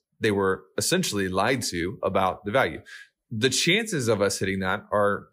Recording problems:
none

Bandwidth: 15.5 kHz